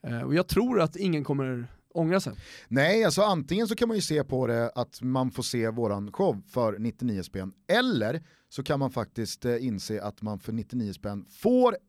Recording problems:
none

